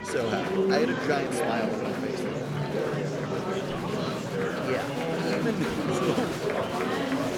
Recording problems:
murmuring crowd; very loud; throughout; 3 dB above the speech

